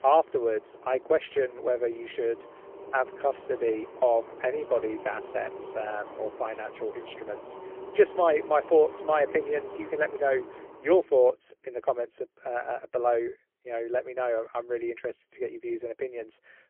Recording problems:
phone-call audio; poor line; nothing above 3 kHz
traffic noise; noticeable; until 11 s; 15 dB below the speech

